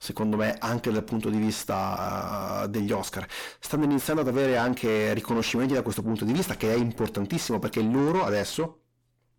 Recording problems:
distortion; heavy; 7 dB below the speech

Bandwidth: 18 kHz